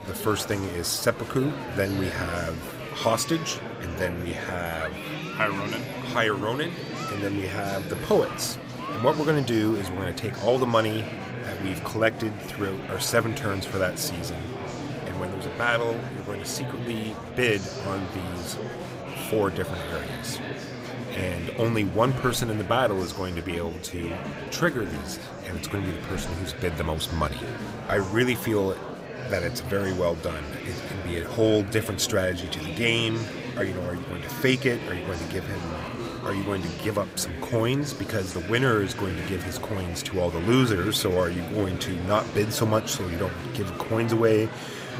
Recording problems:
murmuring crowd; loud; throughout; 7 dB below the speech

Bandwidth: 15.5 kHz